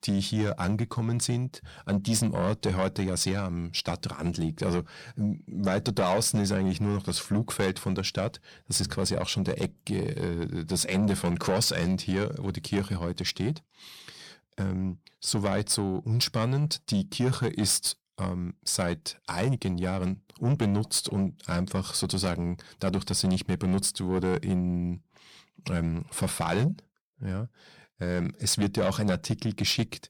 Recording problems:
distortion; slight; 10 dB below the speech

